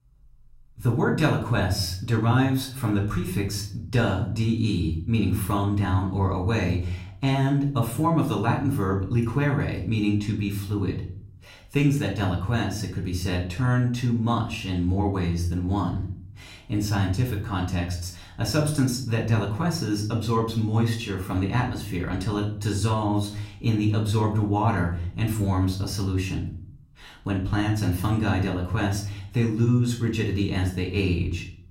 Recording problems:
off-mic speech; far
room echo; slight; dies away in 0.5 s

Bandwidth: 16 kHz